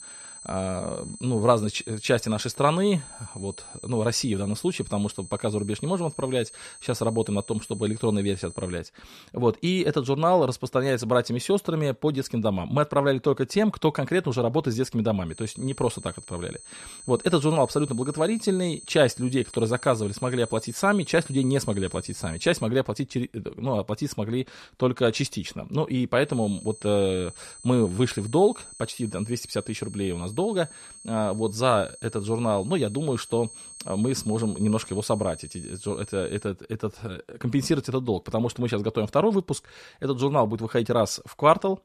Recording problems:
high-pitched whine; noticeable; until 9 s, from 15 to 23 s and from 26 to 36 s; 8.5 kHz, 15 dB below the speech

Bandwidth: 13.5 kHz